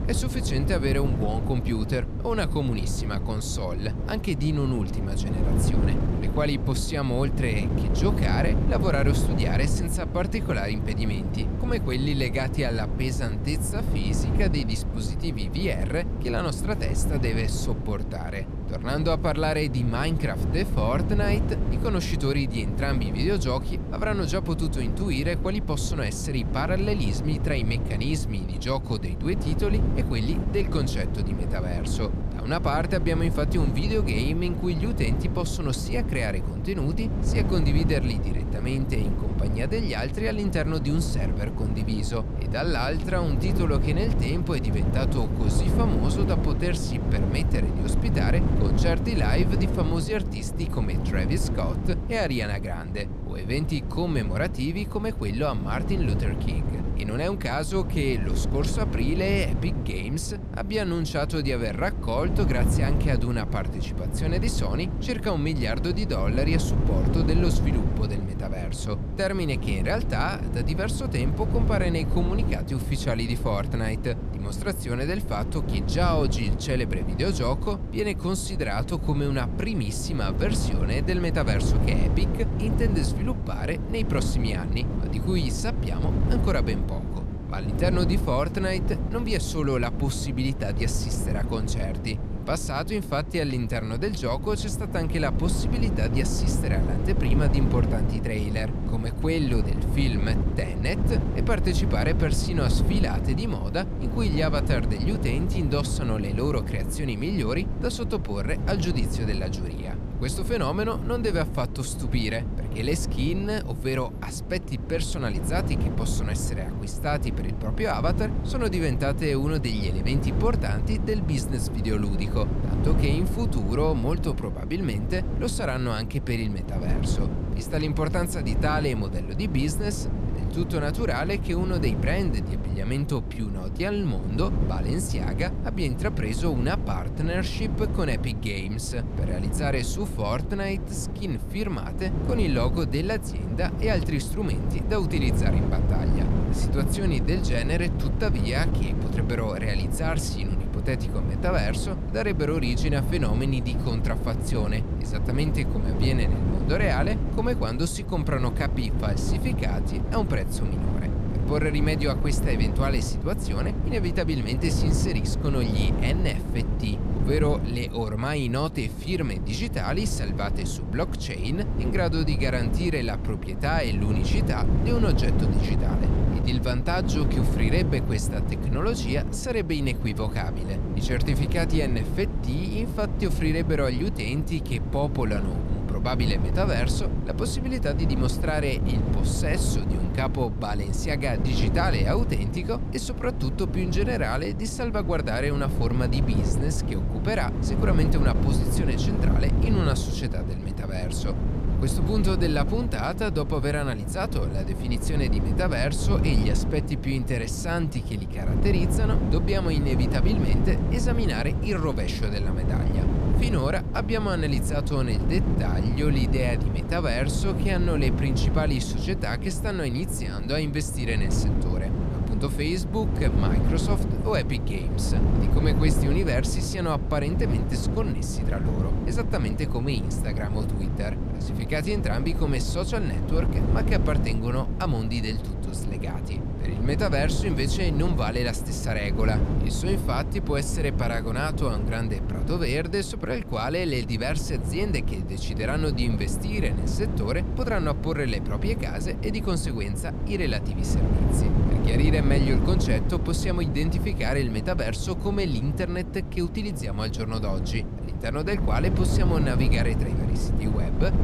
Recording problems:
wind noise on the microphone; heavy; 6 dB below the speech

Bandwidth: 14.5 kHz